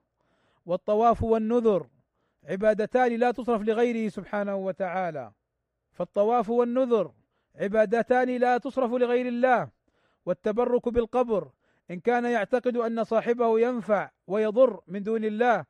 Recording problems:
muffled; slightly; fading above 3 kHz

